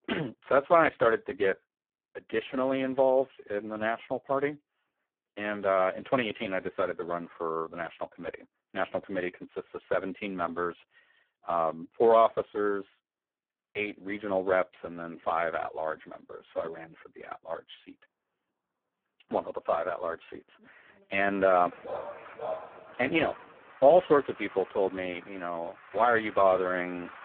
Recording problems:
phone-call audio; poor line
traffic noise; faint; from 14 s on; 20 dB below the speech
dog barking; noticeable; from 22 to 23 s; peak 9 dB below the speech

